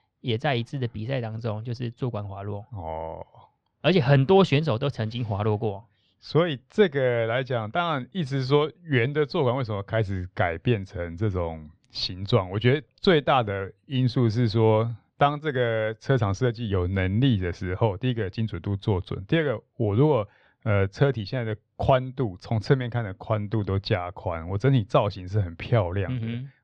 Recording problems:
muffled; slightly; fading above 3.5 kHz

